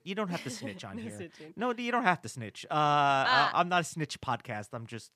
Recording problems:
none

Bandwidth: 15 kHz